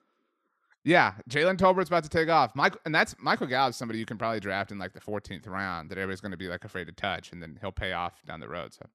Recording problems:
none

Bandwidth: 13.5 kHz